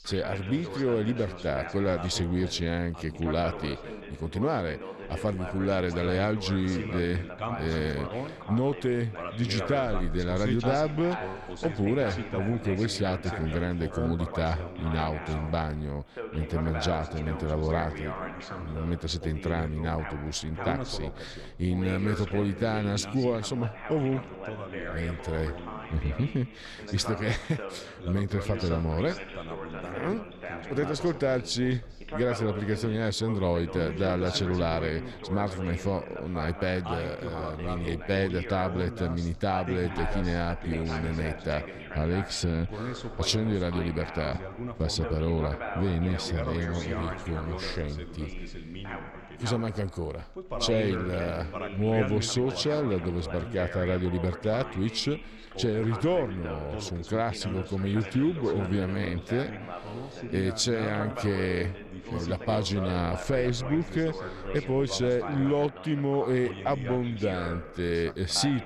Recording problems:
background chatter; loud; throughout; 2 voices, 8 dB below the speech

